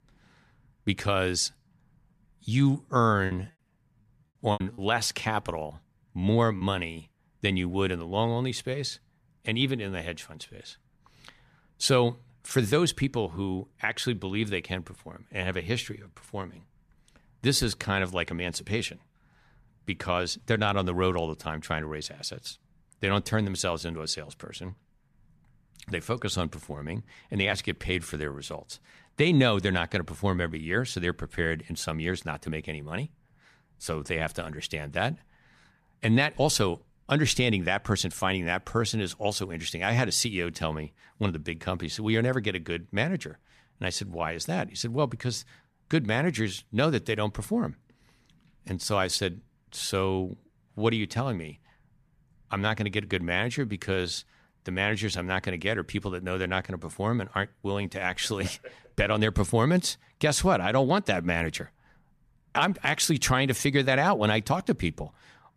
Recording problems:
choppy; very; from 3.5 to 6.5 s; 9% of the speech affected

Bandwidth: 14.5 kHz